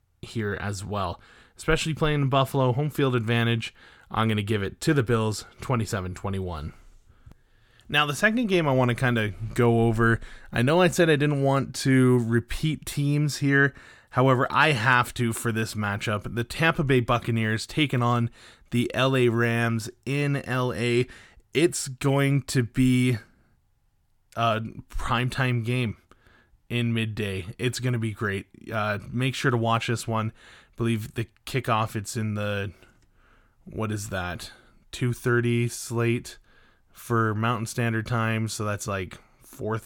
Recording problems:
none

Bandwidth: 17.5 kHz